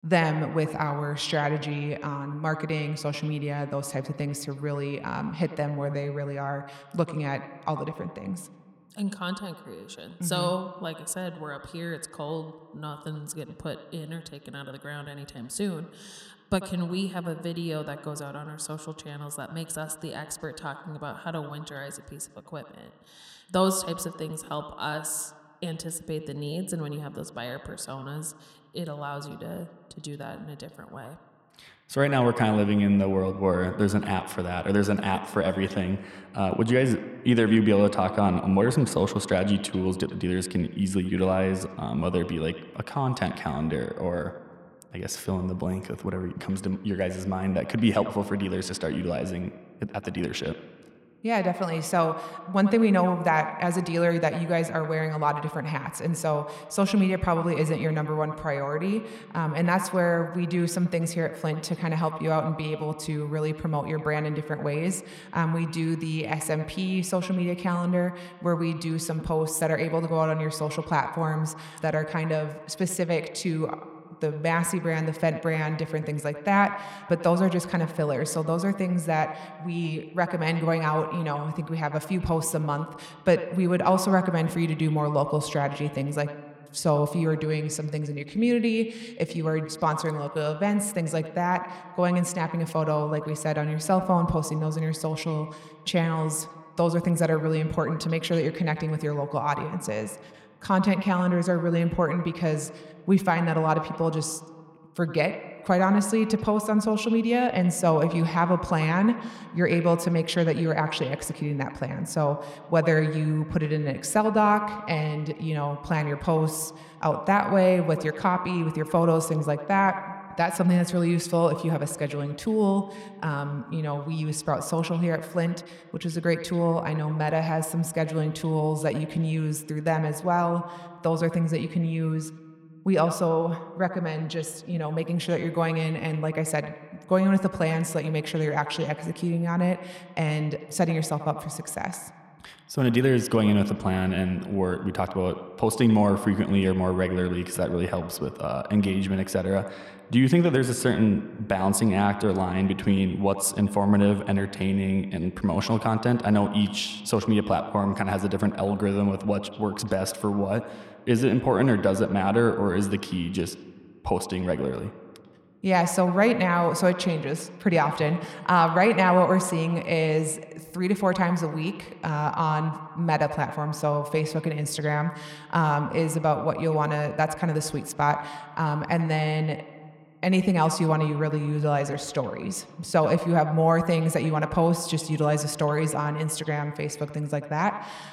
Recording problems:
echo of what is said; strong; throughout; 90 ms later, 10 dB below the speech

